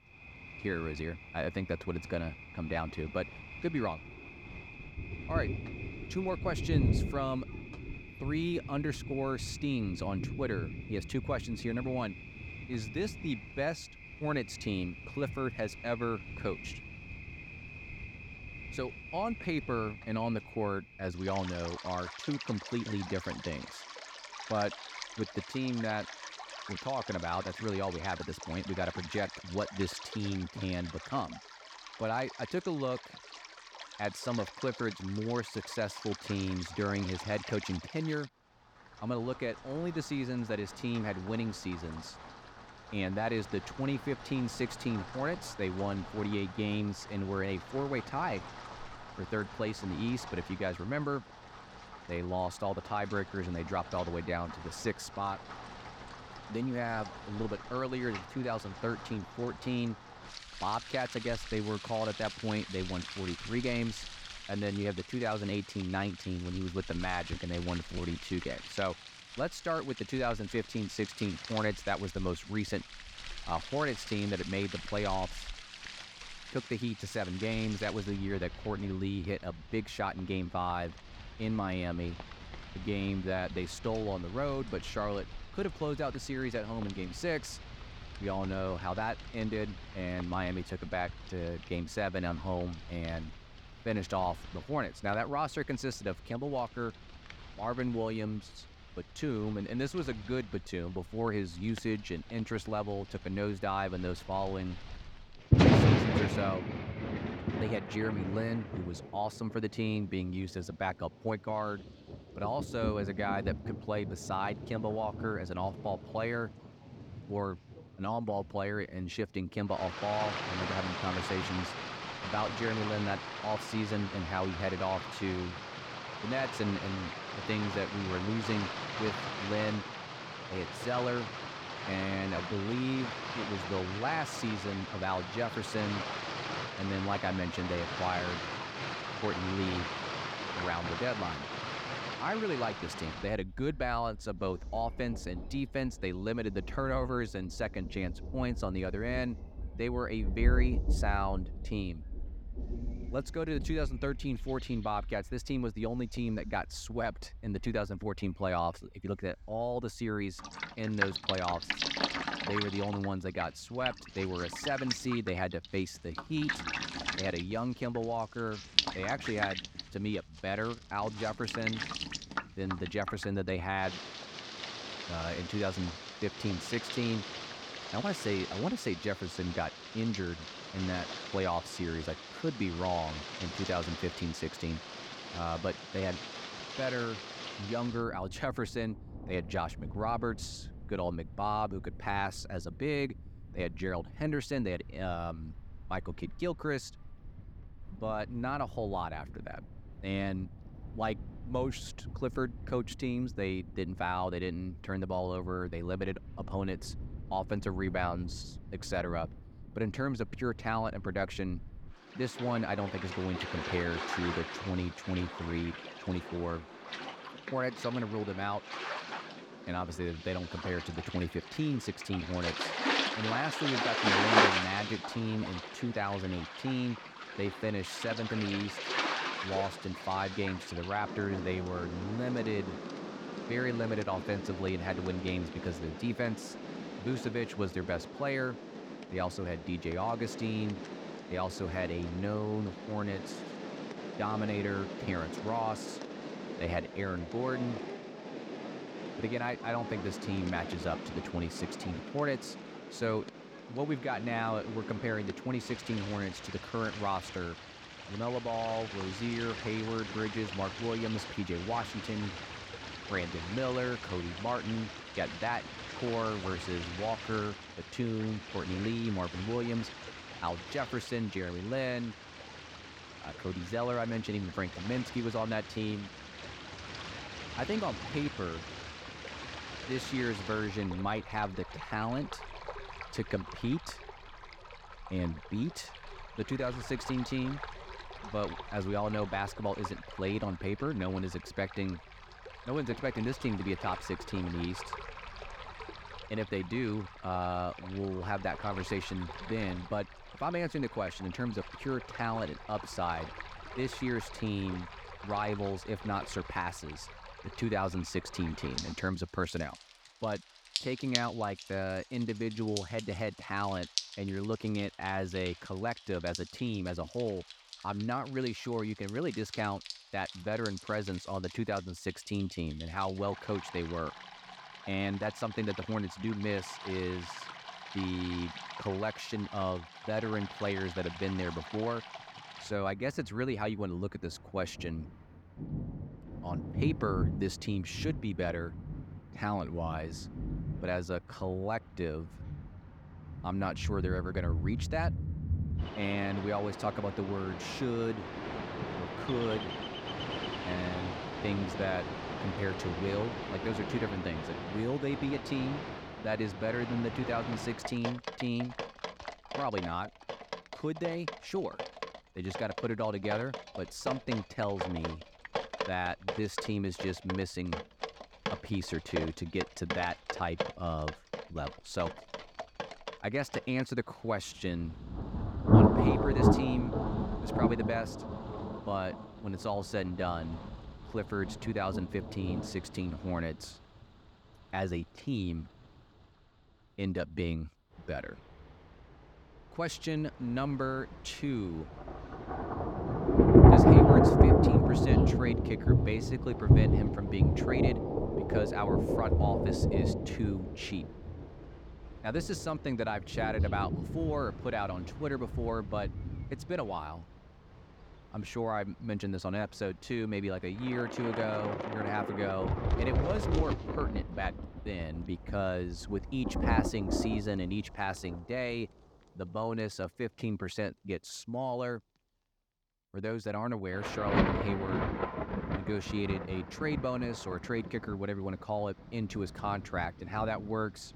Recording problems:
rain or running water; loud; throughout; 1 dB below the speech

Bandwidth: 18 kHz